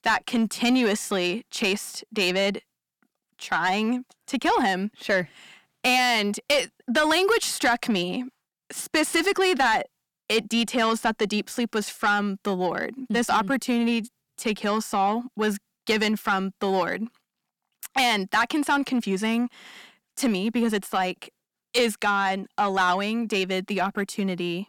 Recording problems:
distortion; slight; 10 dB below the speech

